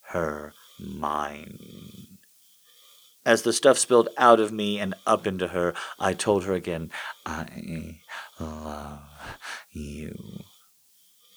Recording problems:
hiss; faint; throughout; 30 dB below the speech

